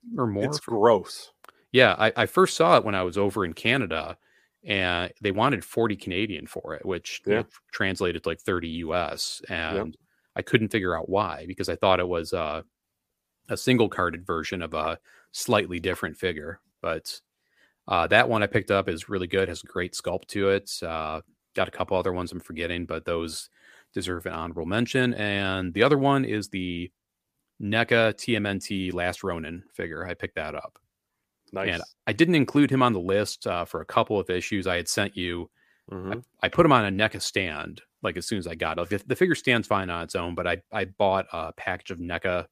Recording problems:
none

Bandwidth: 15 kHz